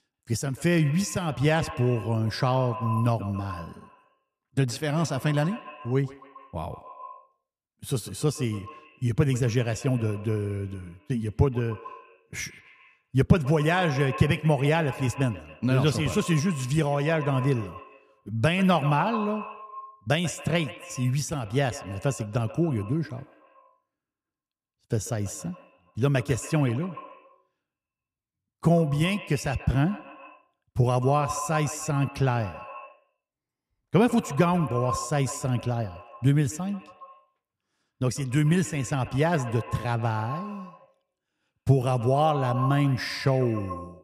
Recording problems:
echo of what is said; noticeable; throughout; 140 ms later, 15 dB below the speech

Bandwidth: 14.5 kHz